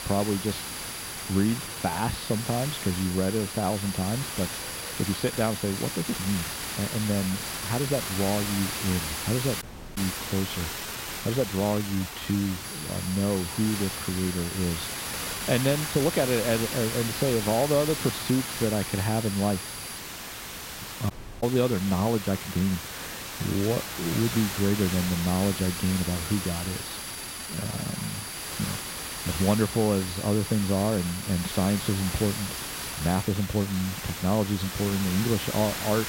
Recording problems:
muffled; slightly; fading above 3.5 kHz
hiss; loud; throughout; 5 dB below the speech
high-pitched whine; noticeable; until 10 s, from 13 to 20 s and from 25 to 33 s; 10 kHz, 10 dB below the speech
uneven, jittery; strongly; from 1.5 to 34 s
audio cutting out; at 9.5 s and at 21 s

